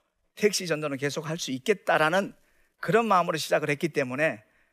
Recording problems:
none

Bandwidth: 15 kHz